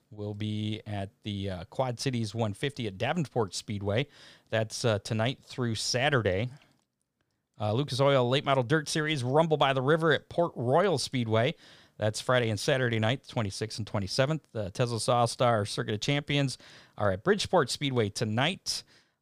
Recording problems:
none

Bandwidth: 15 kHz